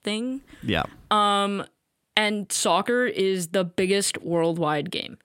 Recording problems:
none

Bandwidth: 16 kHz